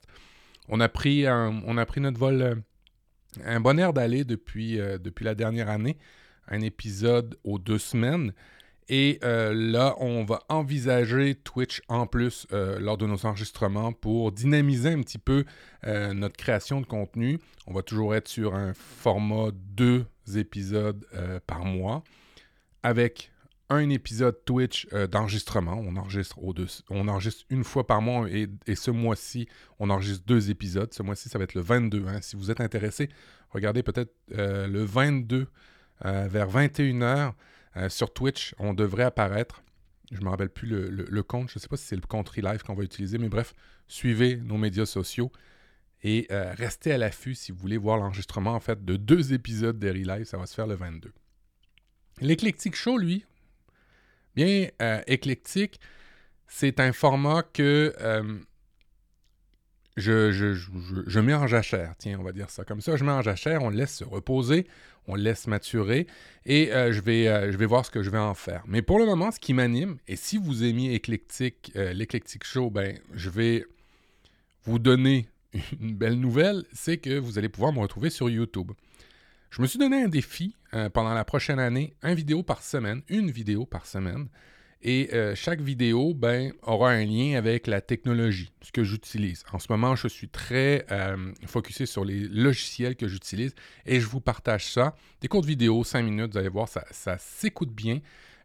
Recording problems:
none

